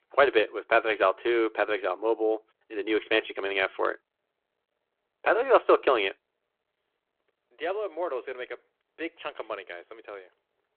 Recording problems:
phone-call audio

